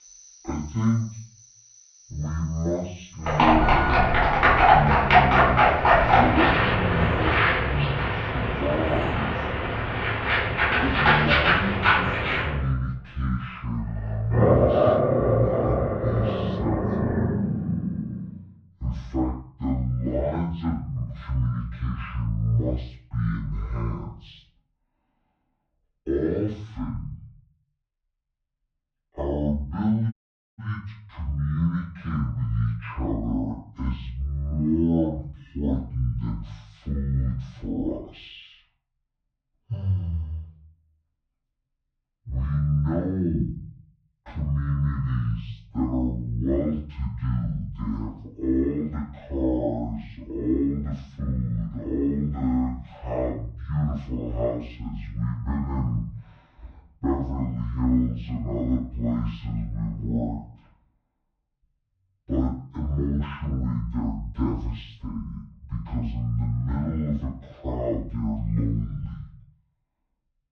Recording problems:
off-mic speech; far
muffled; very; fading above 2 kHz
wrong speed and pitch; too slow and too low; 0.5 times normal speed
room echo; slight; dies away in 0.4 s
animal sounds; very loud; until 18 s; 7 dB above the speech
audio cutting out; at 30 s

